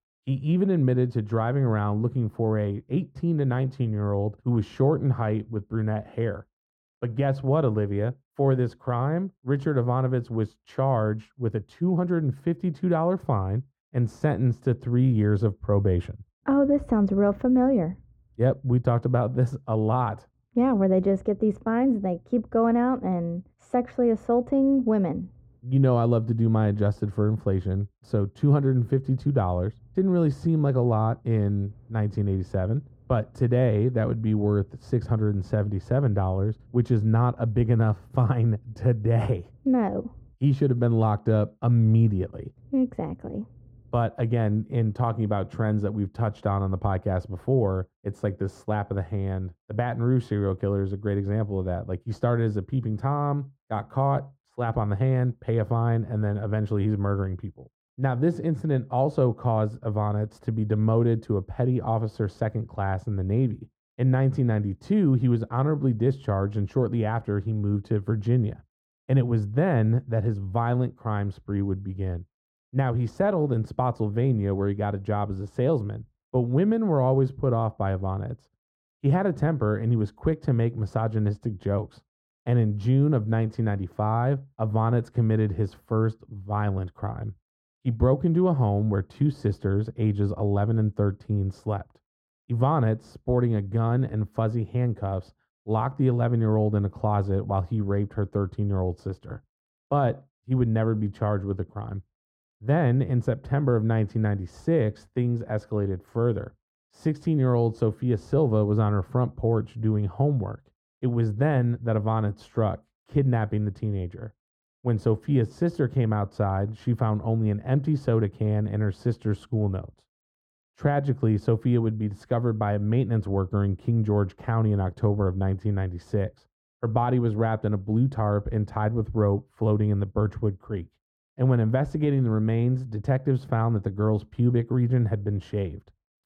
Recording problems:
muffled; very; fading above 2 kHz

